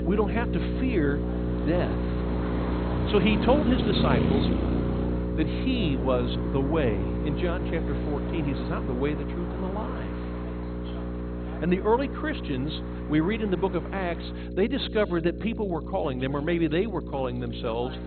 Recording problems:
garbled, watery; badly; nothing above 4 kHz
electrical hum; loud; throughout; 60 Hz, 7 dB below the speech
traffic noise; loud; throughout; 6 dB below the speech
voice in the background; faint; throughout; 25 dB below the speech

